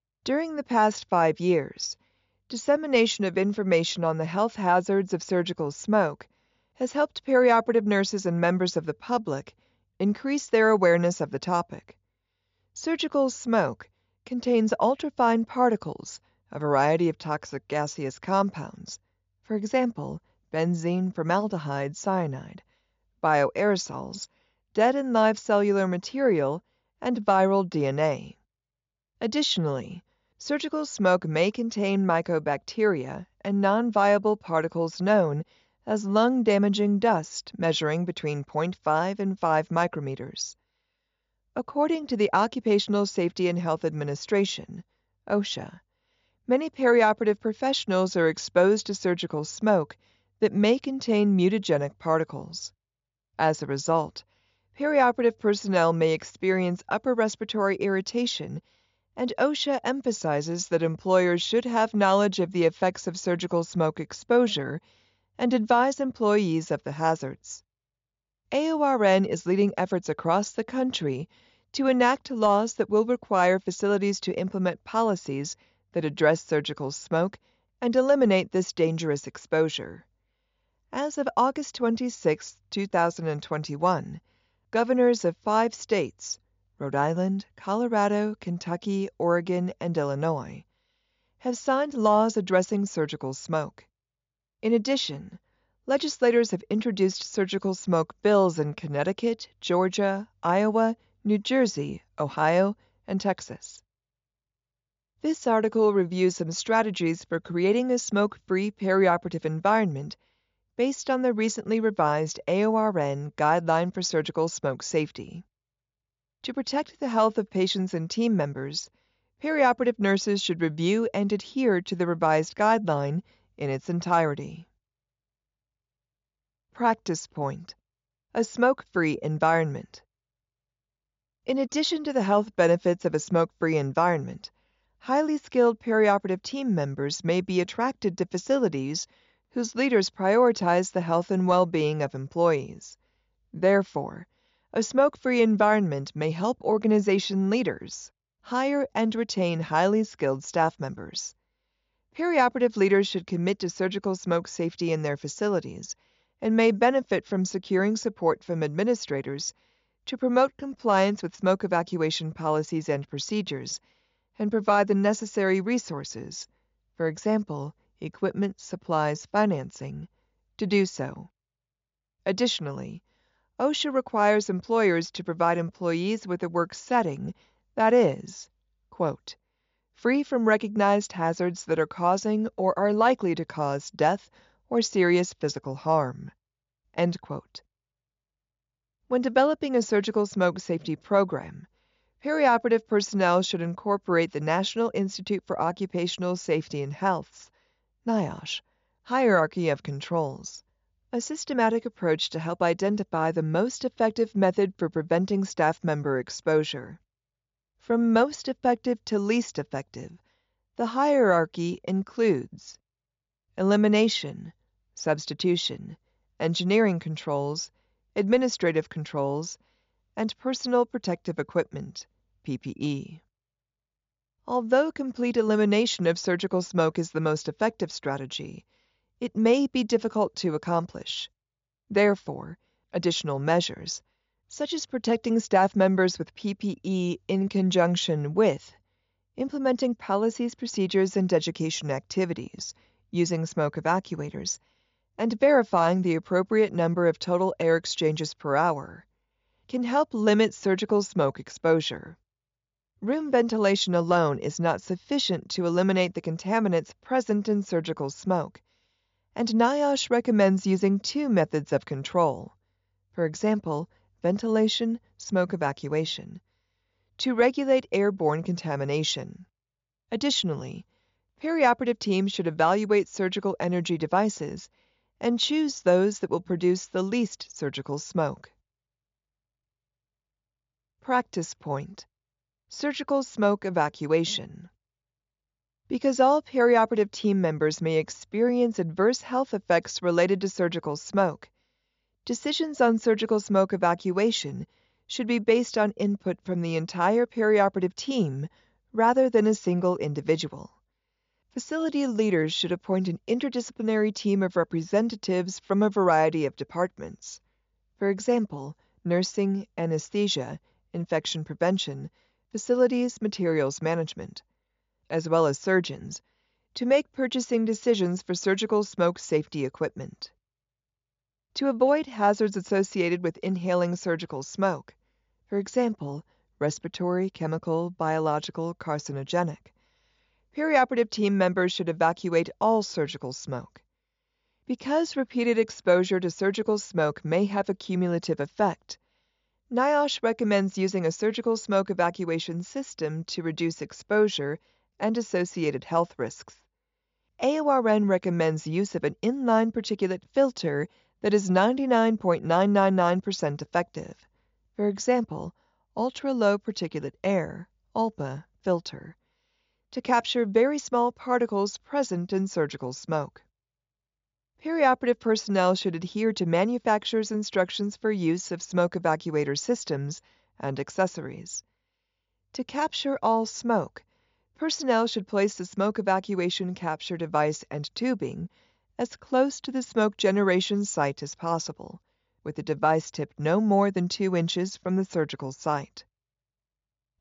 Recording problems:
high frequencies cut off; noticeable; nothing above 7 kHz

